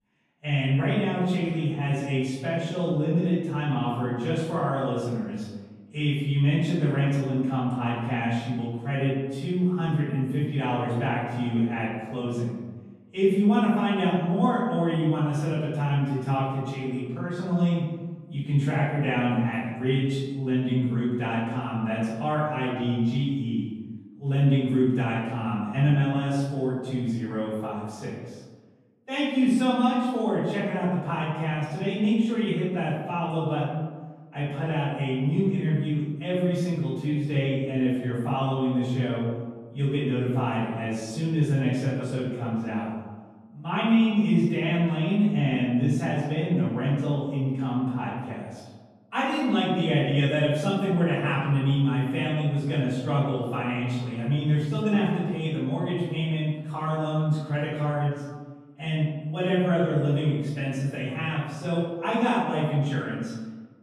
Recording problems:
room echo; strong; dies away in 1.3 s
off-mic speech; far

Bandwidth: 14.5 kHz